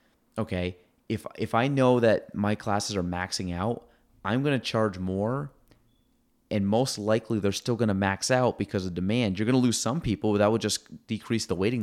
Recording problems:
abrupt cut into speech; at the end

